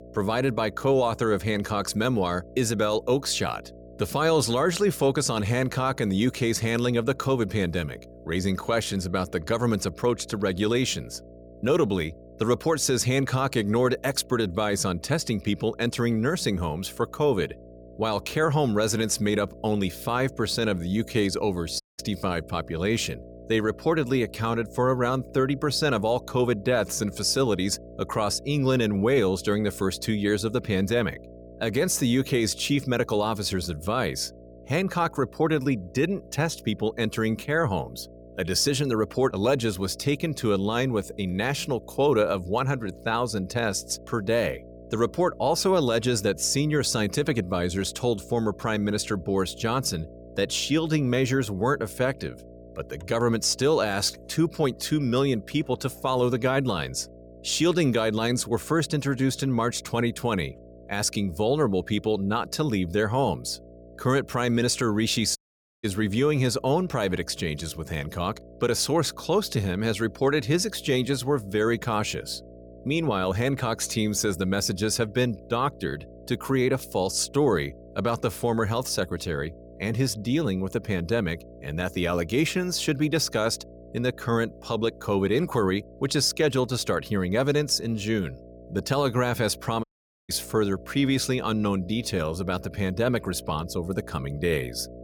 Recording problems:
electrical hum; faint; throughout; 60 Hz, 20 dB below the speech
audio cutting out; at 22 s, at 1:05 and at 1:30

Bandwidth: 18.5 kHz